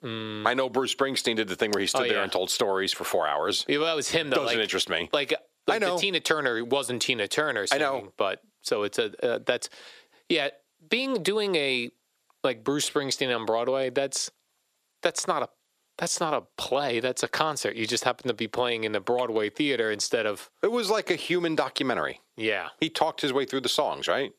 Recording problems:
thin; somewhat; fading below 400 Hz
squashed, flat; somewhat

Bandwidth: 14.5 kHz